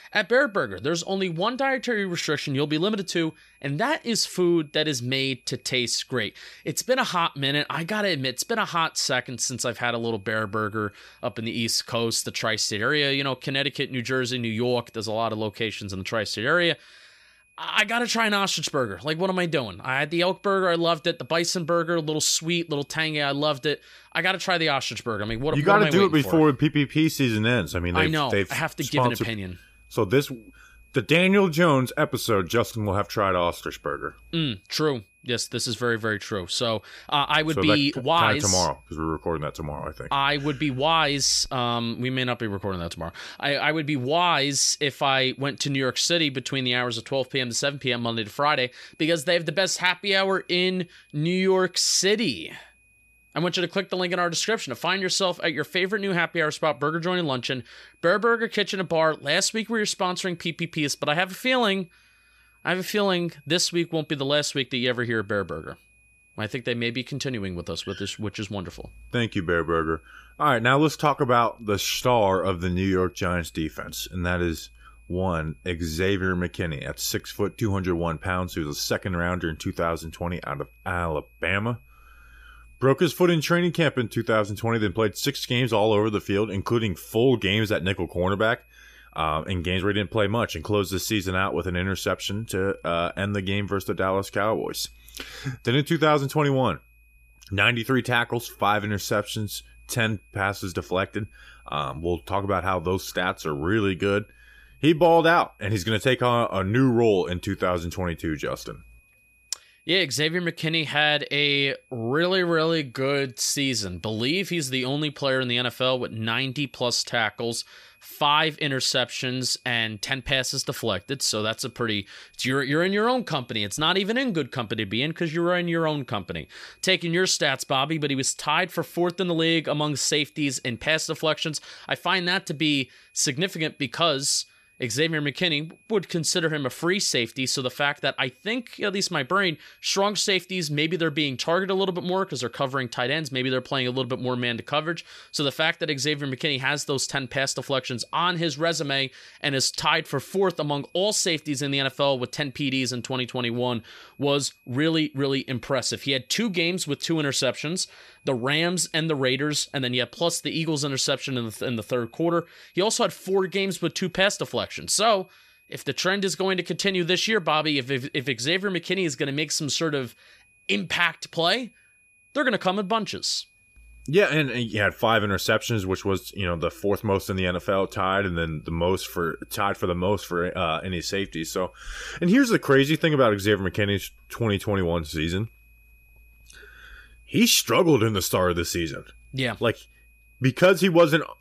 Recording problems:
high-pitched whine; faint; throughout; 2.5 kHz, 35 dB below the speech

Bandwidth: 14.5 kHz